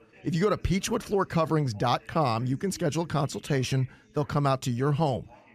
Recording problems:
background chatter; faint; throughout; 2 voices, 25 dB below the speech

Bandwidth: 14.5 kHz